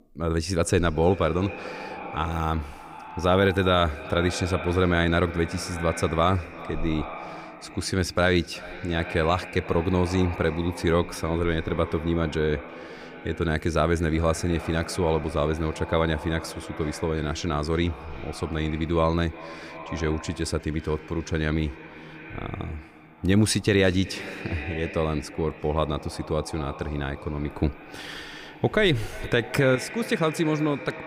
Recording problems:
echo of what is said; noticeable; throughout; 360 ms later, 15 dB below the speech

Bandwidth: 15.5 kHz